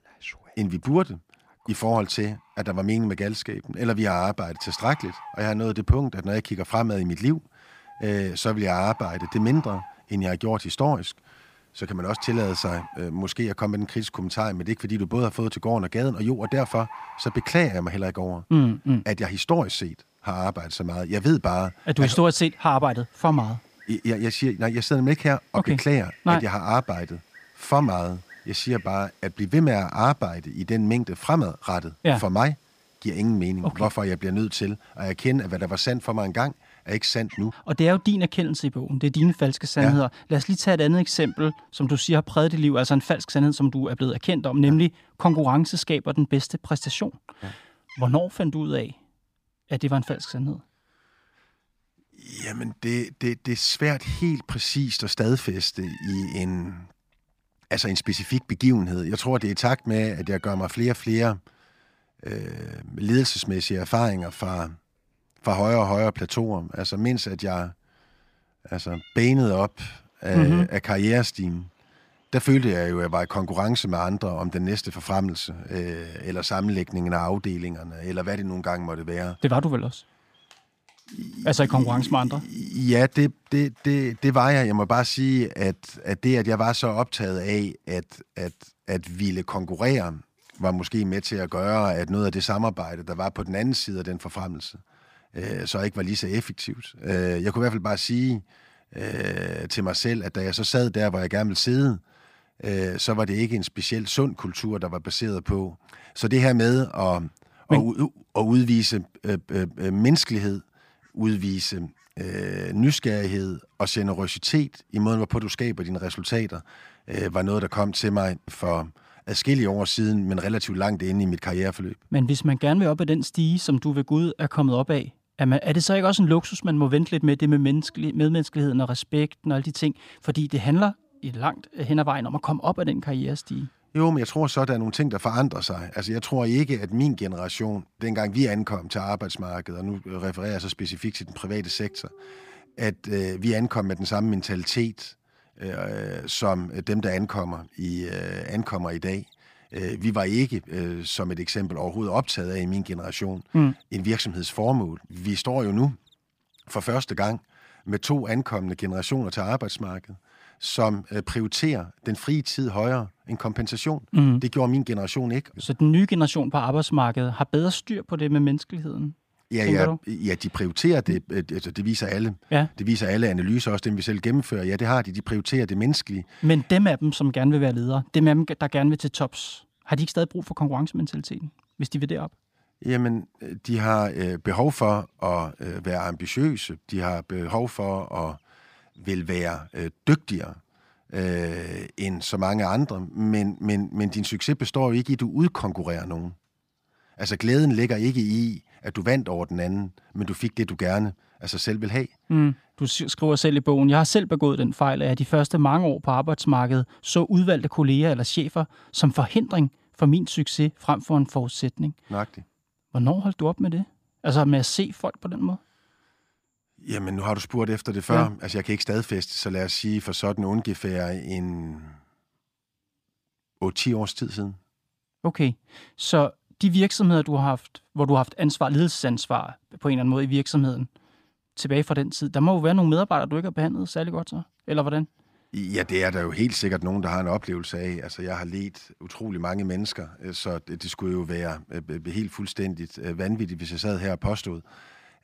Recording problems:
animal sounds; faint; throughout; 25 dB below the speech

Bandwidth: 15 kHz